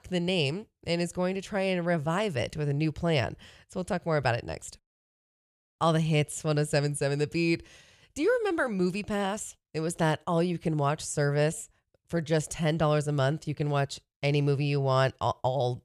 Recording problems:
none

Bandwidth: 14.5 kHz